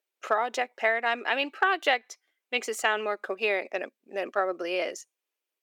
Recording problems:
thin; very; fading below 400 Hz

